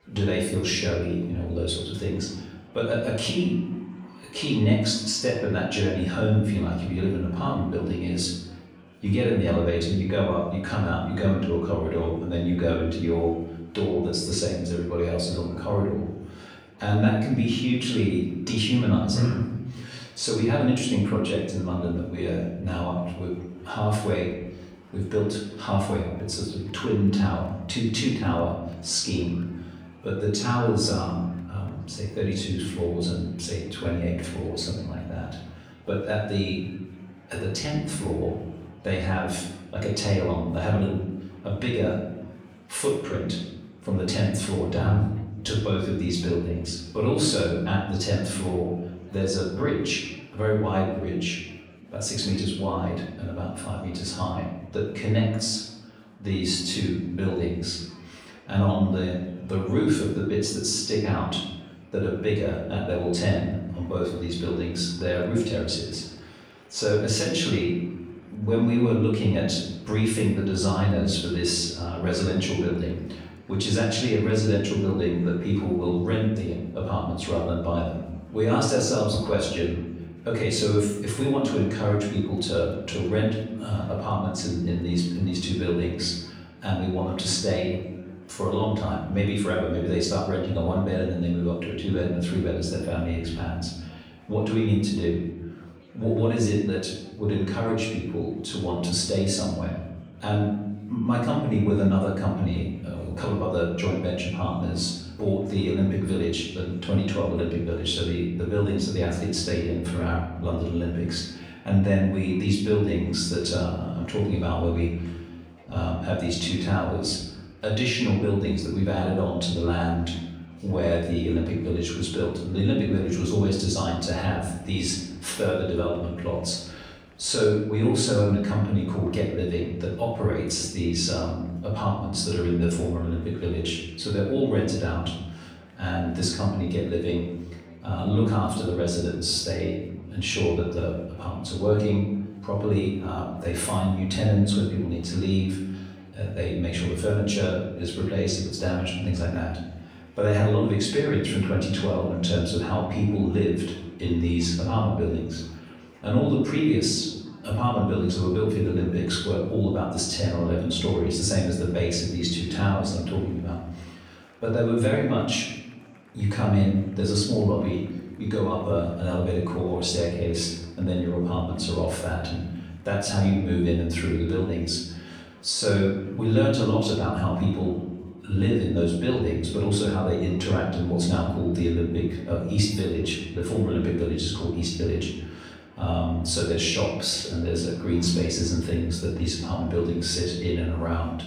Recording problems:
off-mic speech; far
room echo; noticeable; dies away in 0.9 s
murmuring crowd; faint; throughout; 30 dB below the speech

